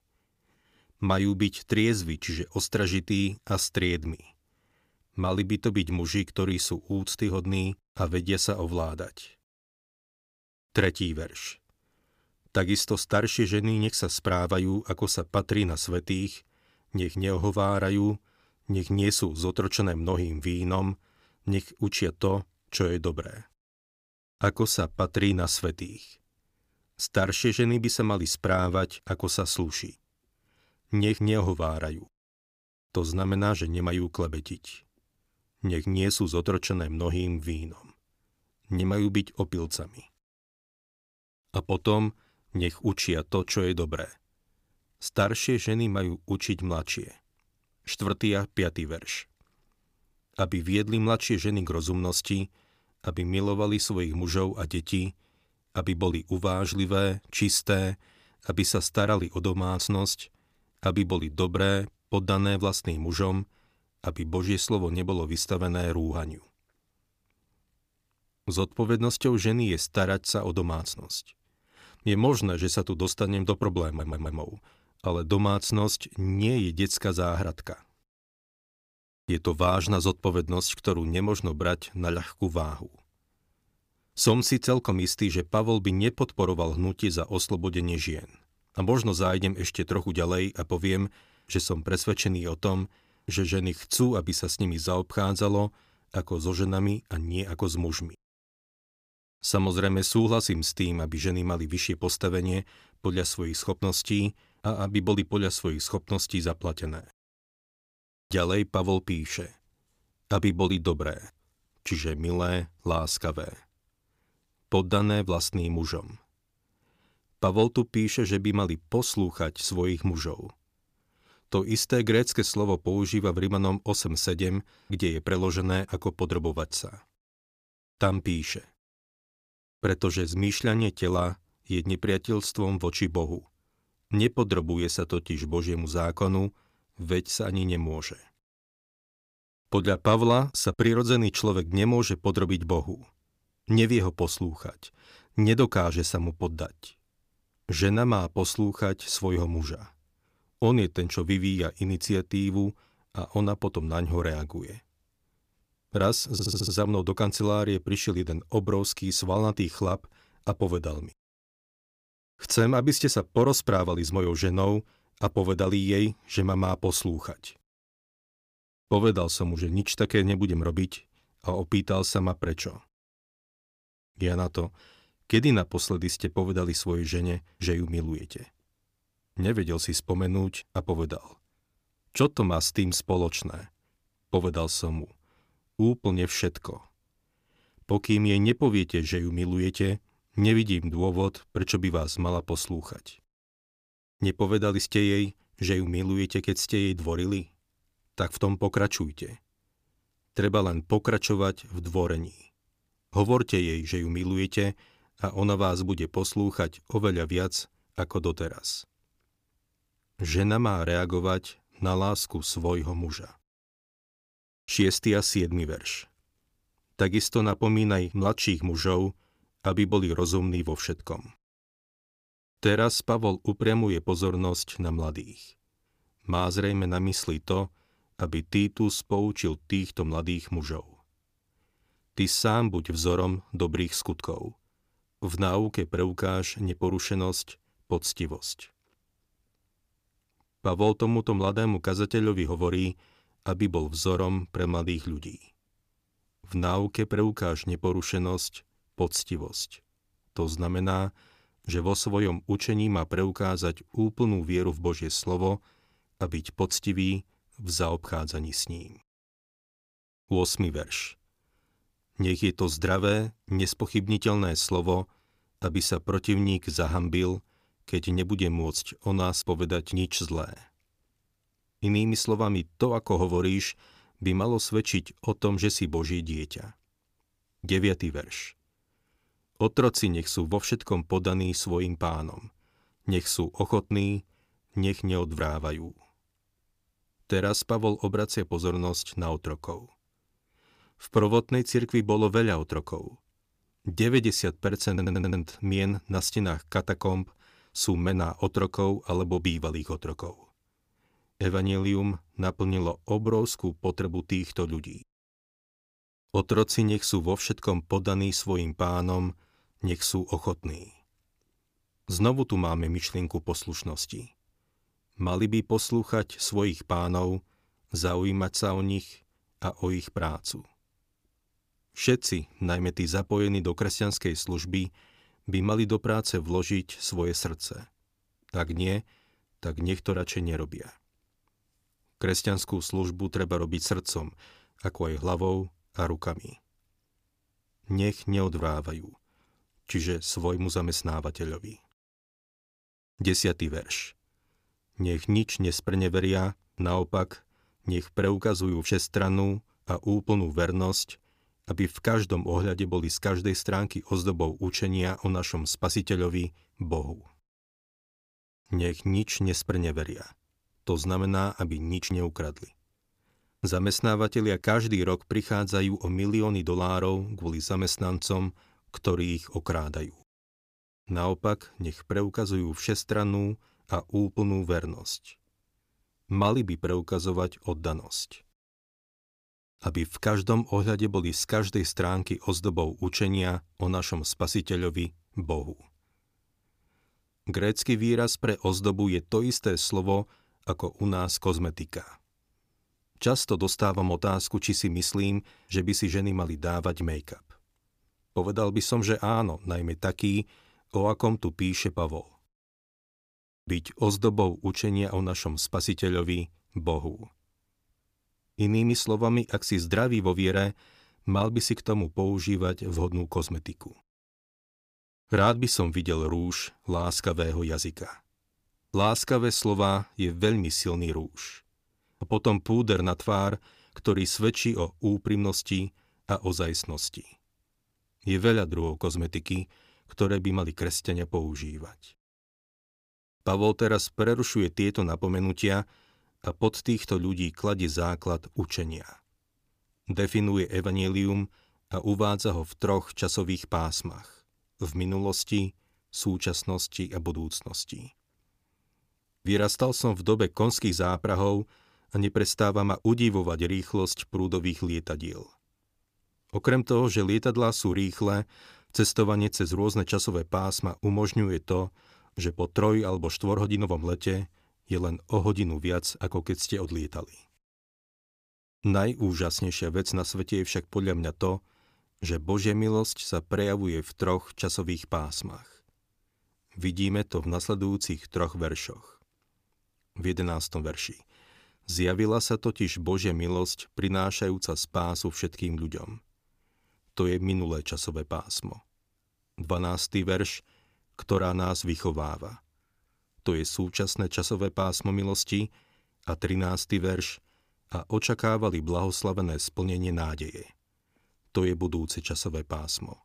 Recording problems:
audio stuttering; at 1:14, at 2:36 and at 4:55

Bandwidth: 15 kHz